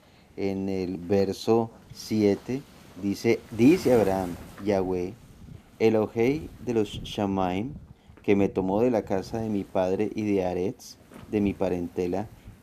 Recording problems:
wind noise on the microphone; occasional gusts; 20 dB below the speech

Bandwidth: 14.5 kHz